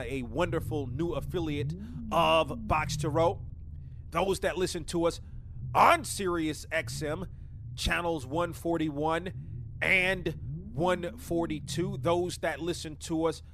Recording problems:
low rumble; faint; throughout; 25 dB below the speech
abrupt cut into speech; at the start

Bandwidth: 14.5 kHz